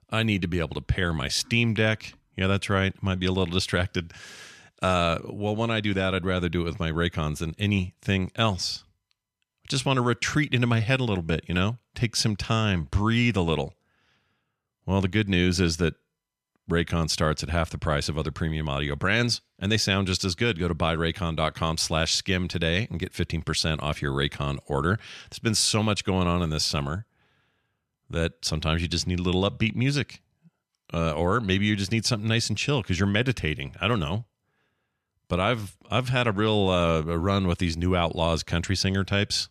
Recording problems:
none

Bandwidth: 13.5 kHz